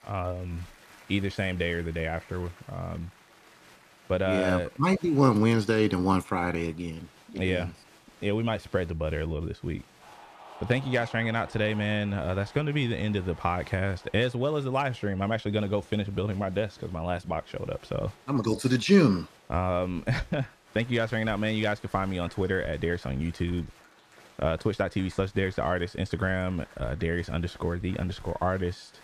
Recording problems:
crowd noise; faint; throughout; 25 dB below the speech

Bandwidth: 14.5 kHz